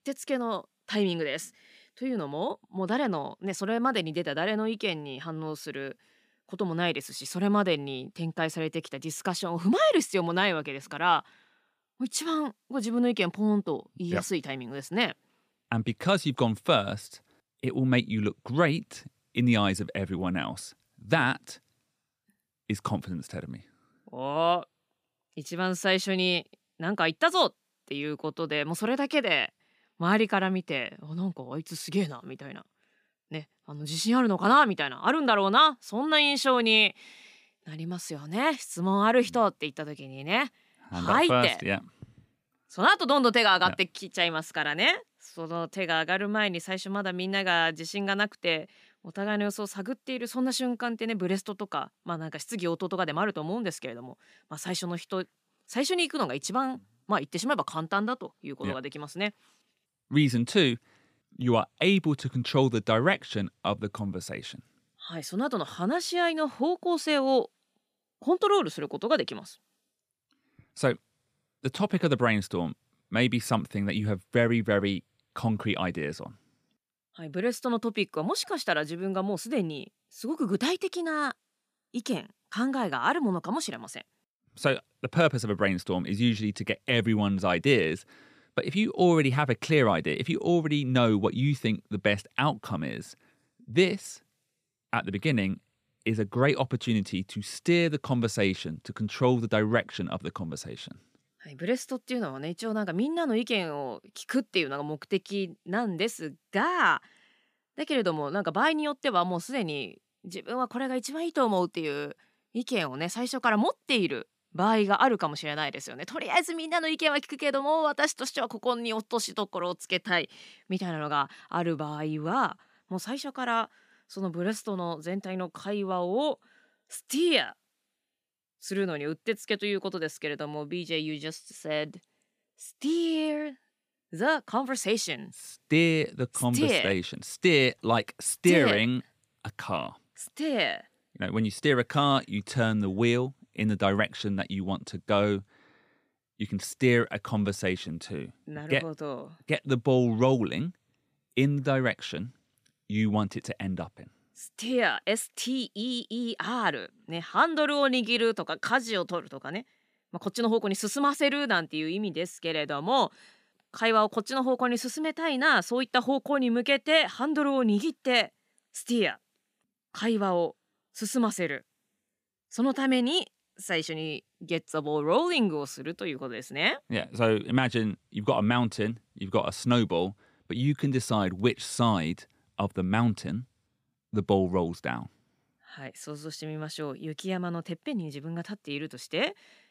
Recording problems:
none

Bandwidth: 15 kHz